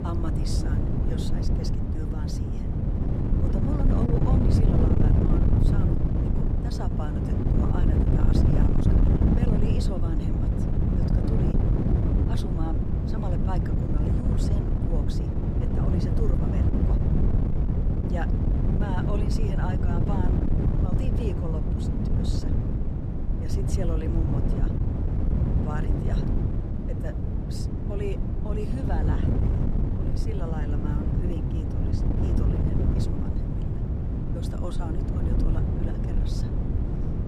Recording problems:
wind noise on the microphone; heavy; 4 dB above the speech

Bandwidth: 15 kHz